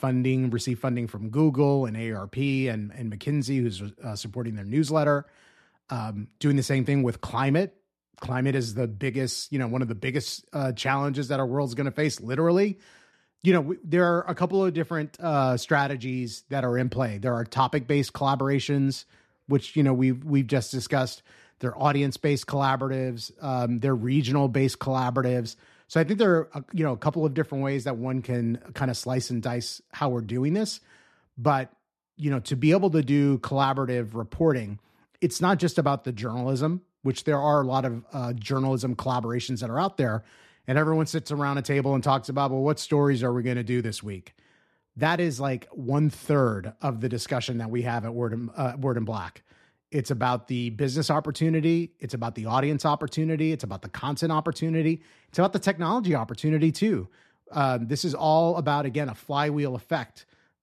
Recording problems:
none

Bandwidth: 13.5 kHz